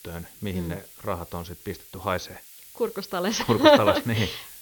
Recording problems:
high frequencies cut off; noticeable; nothing above 6.5 kHz
hiss; noticeable; throughout; 20 dB below the speech

